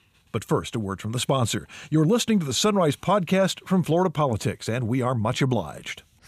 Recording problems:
none

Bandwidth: 15 kHz